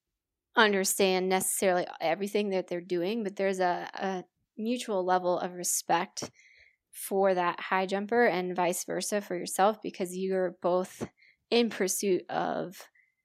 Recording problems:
none

